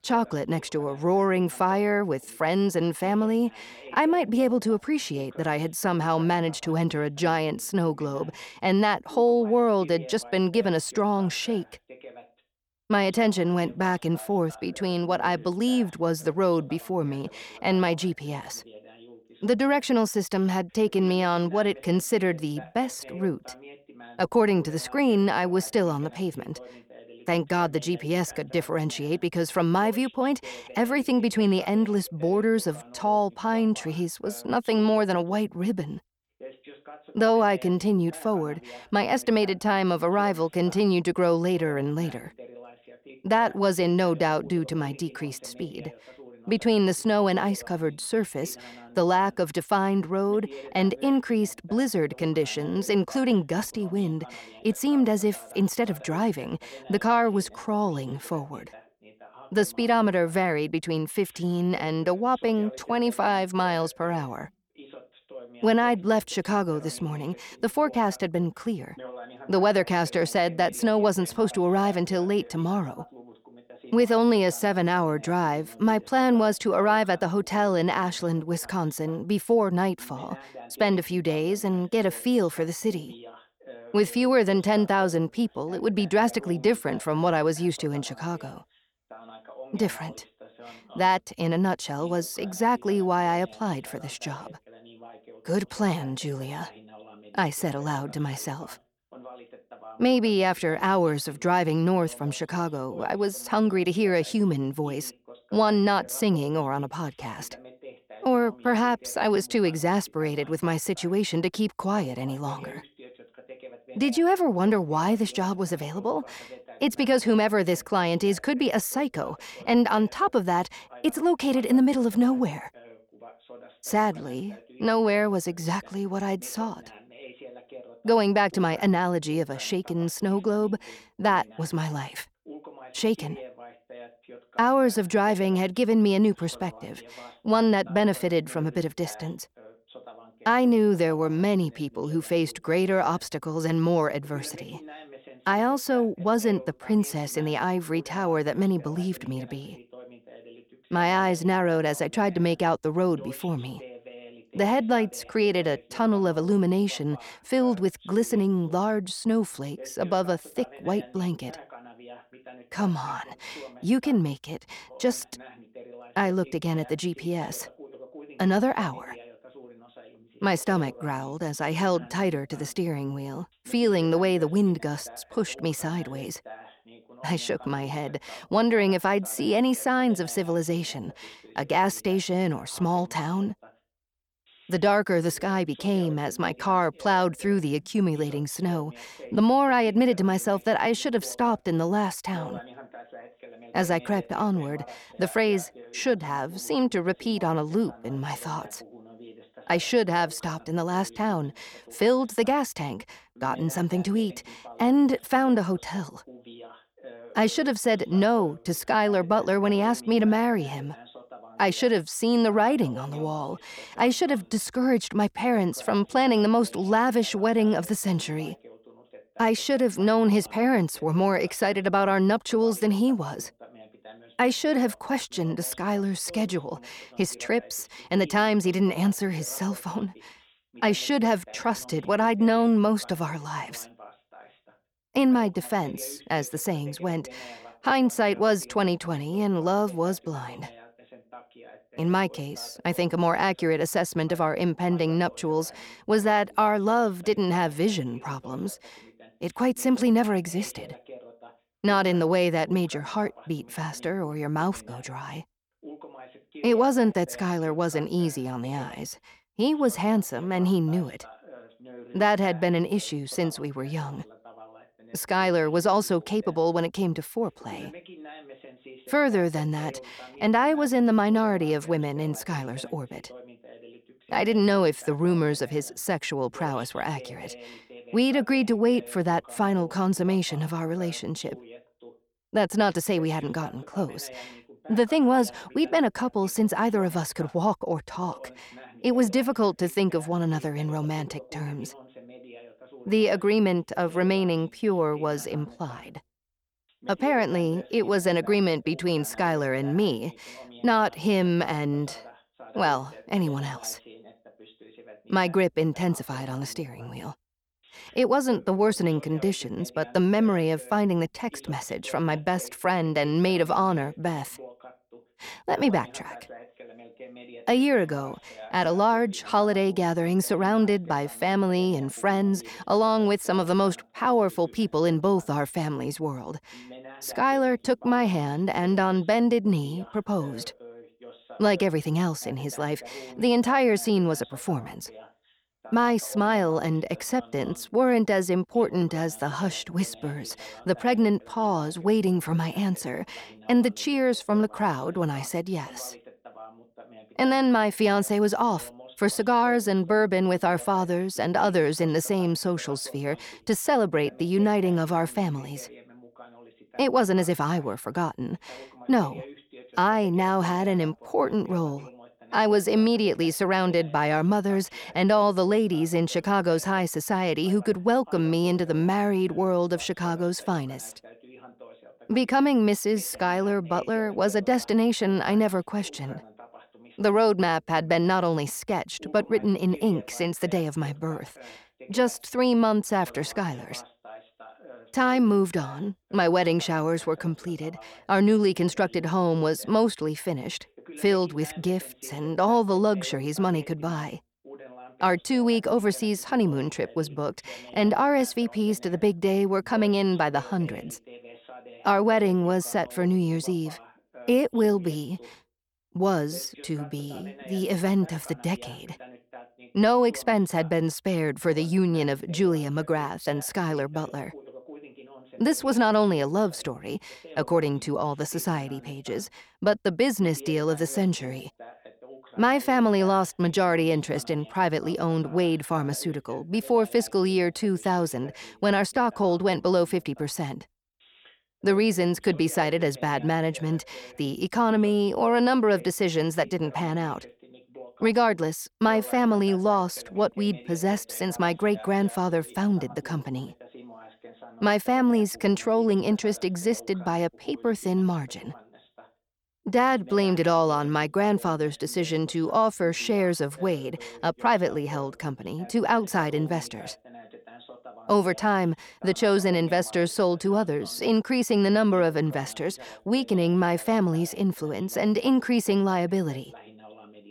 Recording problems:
voice in the background; faint; throughout; 20 dB below the speech

